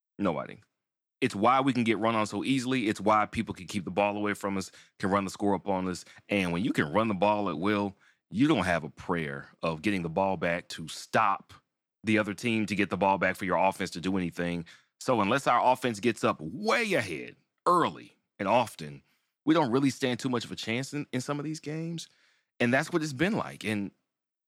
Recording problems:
uneven, jittery; slightly; from 5.5 to 22 s

